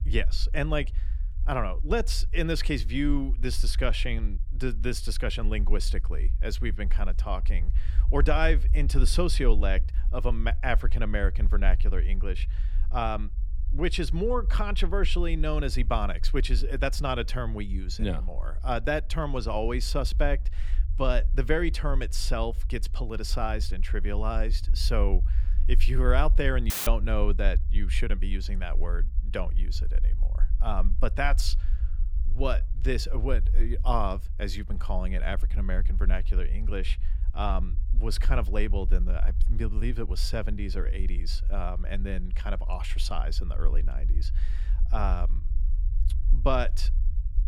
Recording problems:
low rumble; faint; throughout; 20 dB below the speech
audio cutting out; at 27 s

